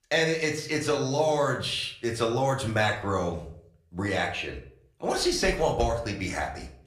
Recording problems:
room echo; slight; dies away in 0.4 s
off-mic speech; somewhat distant

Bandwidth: 15 kHz